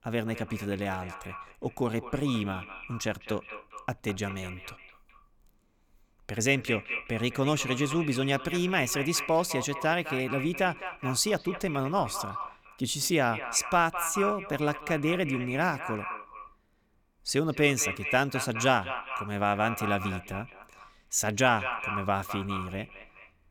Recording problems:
echo of what is said; strong; throughout; 210 ms later, 8 dB below the speech

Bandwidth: 19 kHz